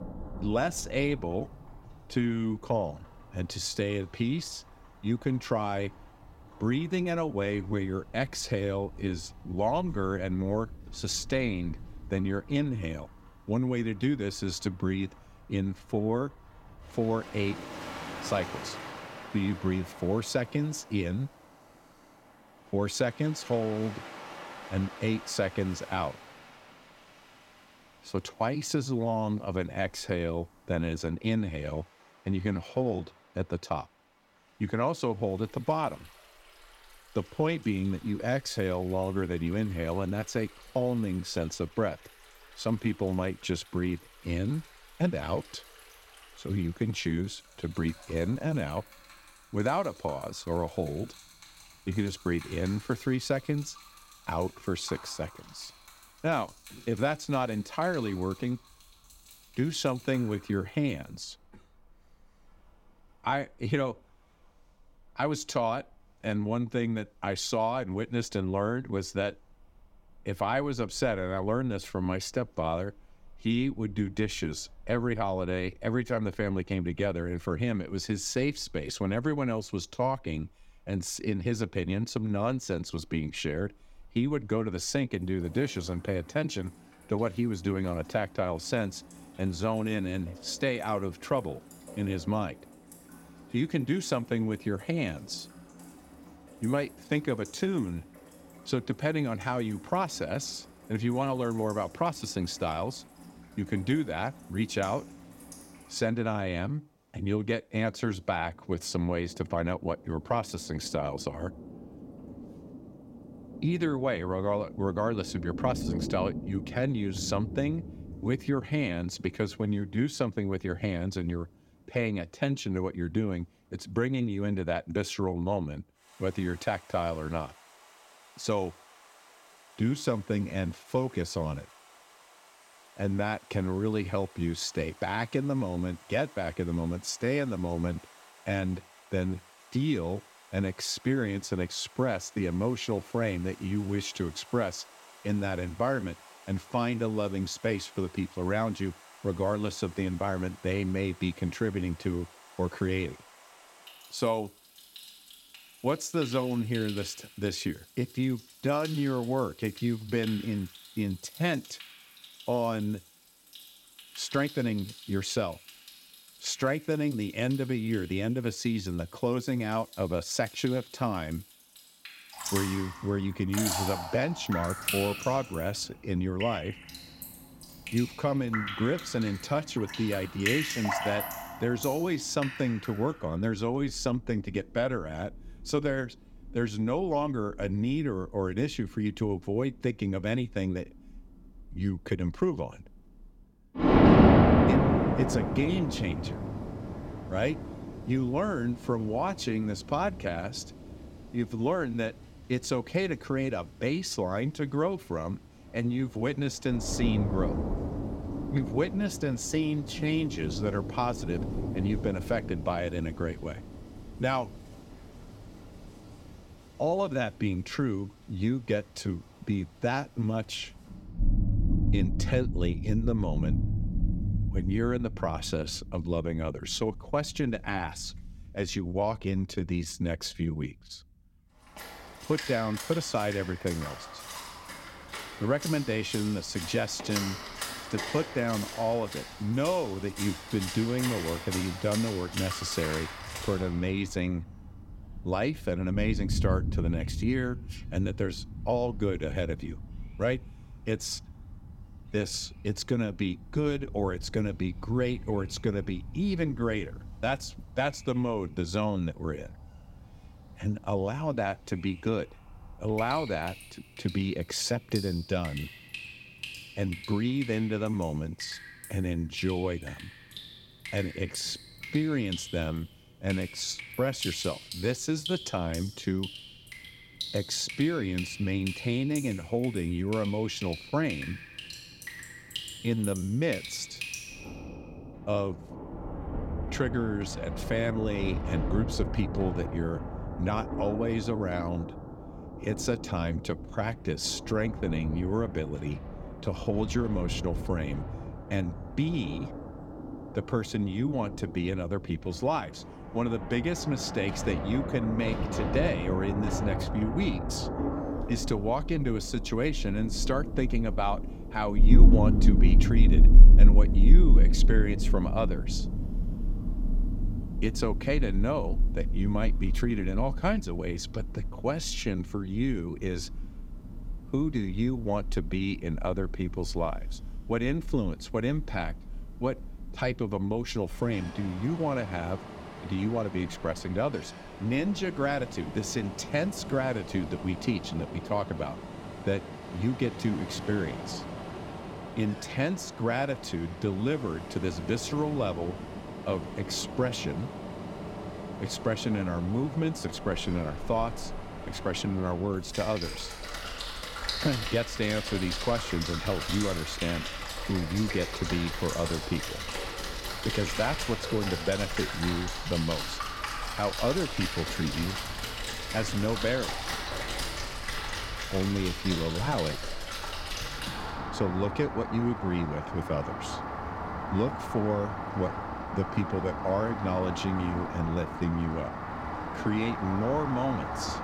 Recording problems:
rain or running water; loud; throughout; 3 dB below the speech

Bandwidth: 16.5 kHz